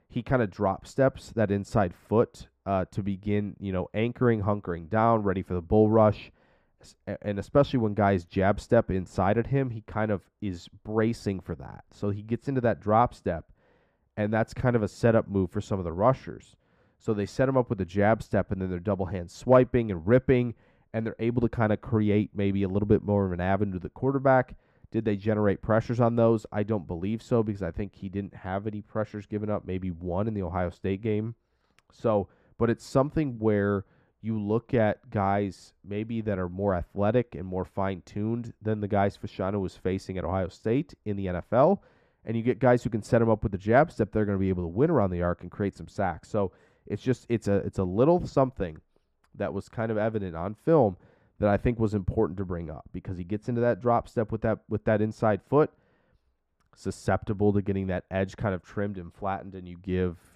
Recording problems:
muffled; very; fading above 2.5 kHz

